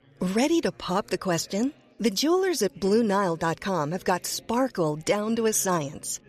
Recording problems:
chatter from many people; faint; throughout; 25 dB below the speech

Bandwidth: 14.5 kHz